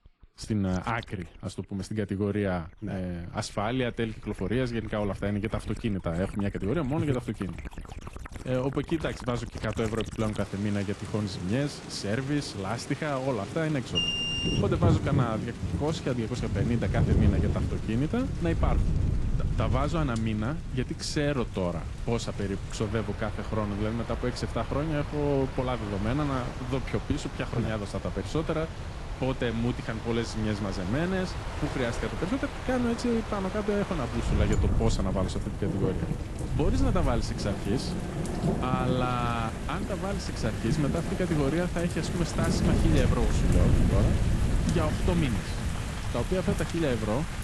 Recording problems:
garbled, watery; slightly; nothing above 11 kHz
rain or running water; loud; throughout; 4 dB below the speech
wind noise on the microphone; occasional gusts; from 17 s on; 15 dB below the speech
alarm; loud; at 14 s; peak 5 dB above the speech

